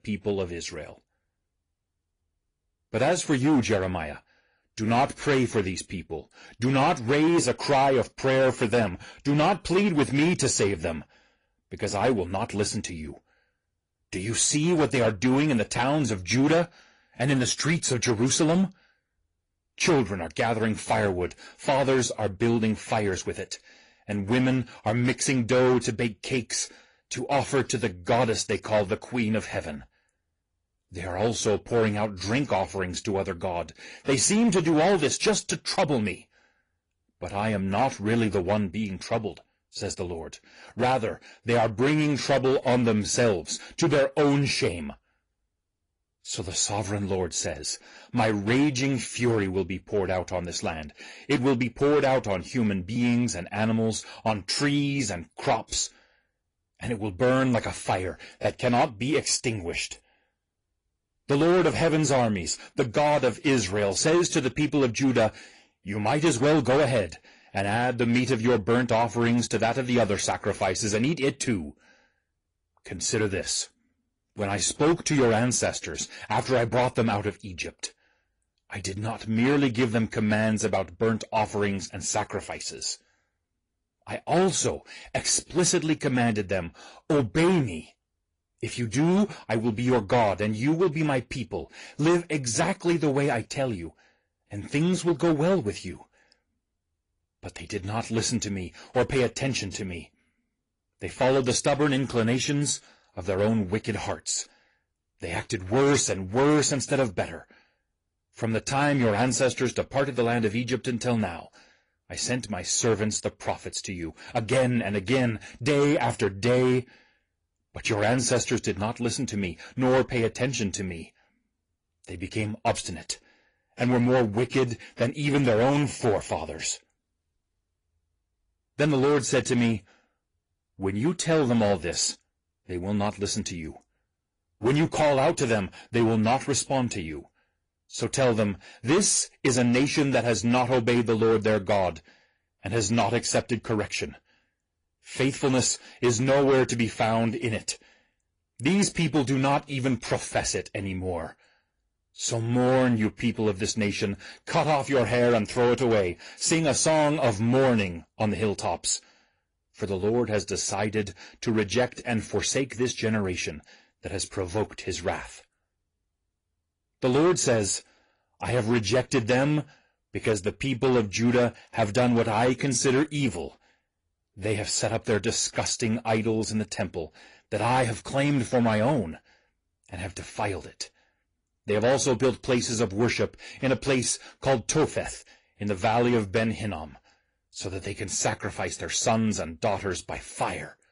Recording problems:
distortion; slight; 6% of the sound clipped
garbled, watery; slightly; nothing above 10.5 kHz

